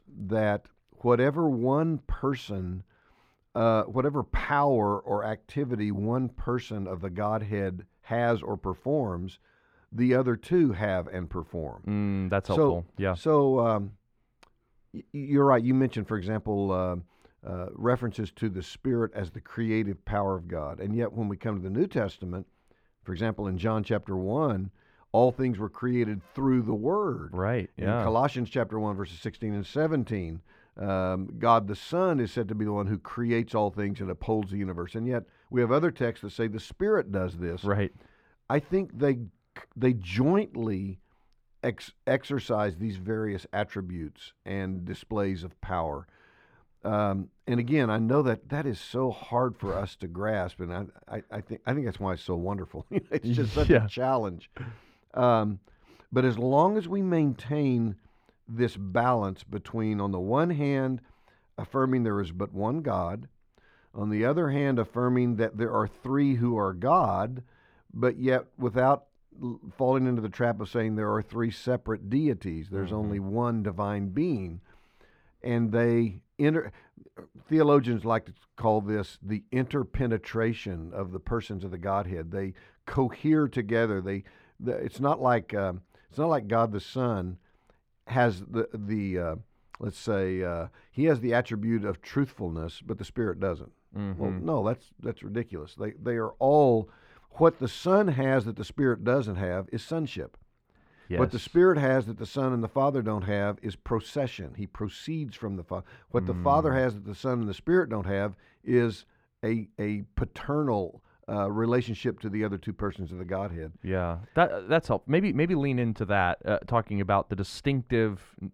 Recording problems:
muffled; slightly; fading above 3 kHz

